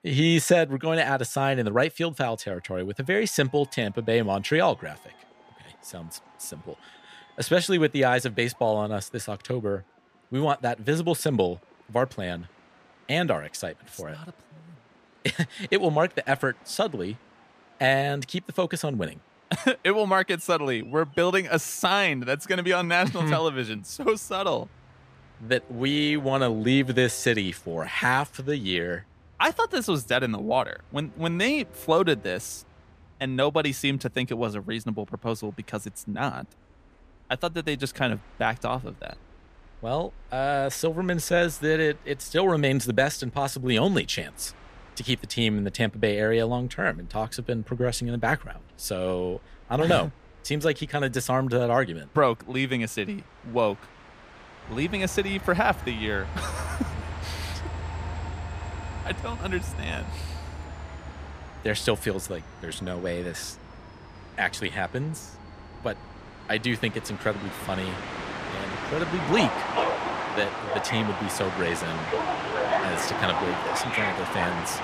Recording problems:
train or aircraft noise; loud; throughout; 7 dB below the speech

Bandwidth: 14.5 kHz